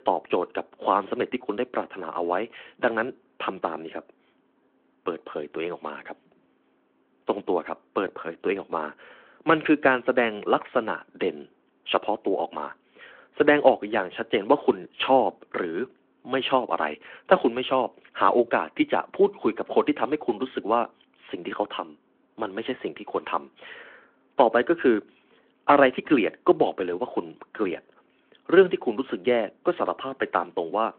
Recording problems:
phone-call audio

